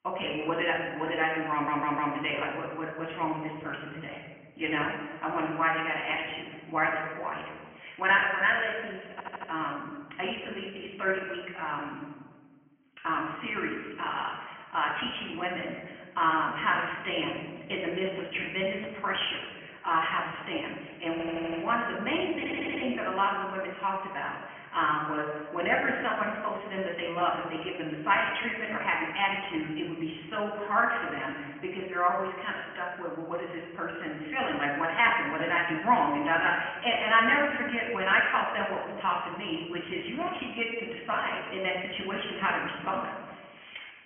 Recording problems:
high frequencies cut off; severe; nothing above 3 kHz
room echo; noticeable; dies away in 1.2 s
thin; somewhat; fading below 750 Hz
off-mic speech; somewhat distant
garbled, watery; slightly
audio stuttering; 4 times, first at 1.5 s

